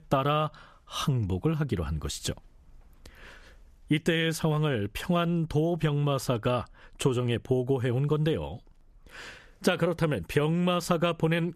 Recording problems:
squashed, flat; somewhat

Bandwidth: 14.5 kHz